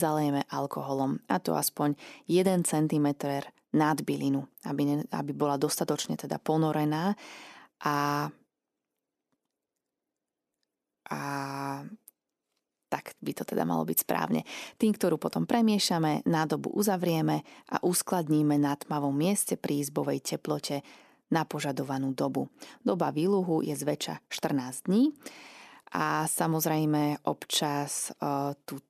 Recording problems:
abrupt cut into speech; at the start

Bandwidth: 14 kHz